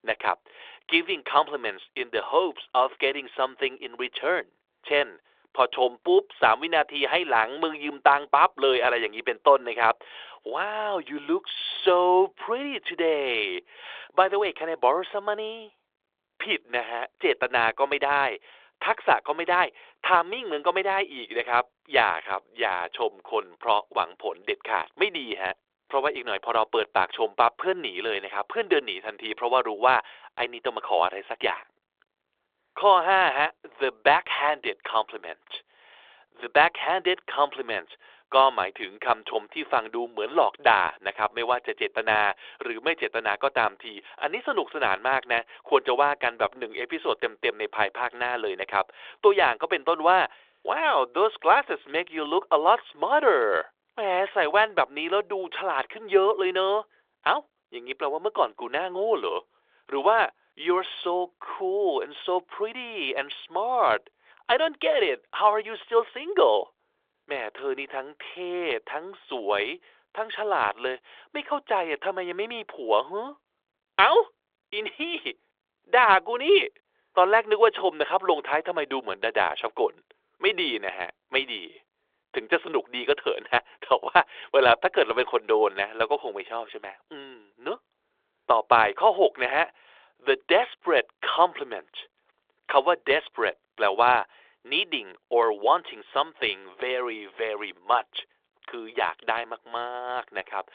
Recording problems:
phone-call audio

